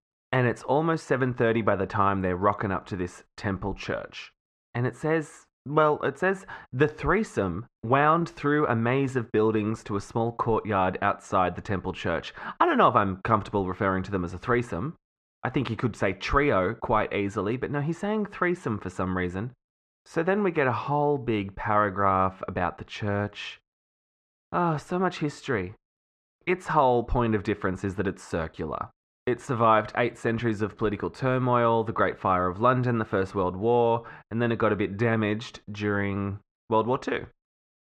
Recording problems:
muffled; very; fading above 2 kHz

